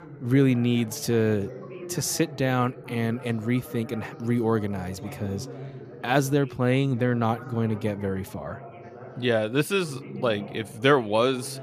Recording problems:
background chatter; noticeable; throughout; 3 voices, 15 dB below the speech

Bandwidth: 14.5 kHz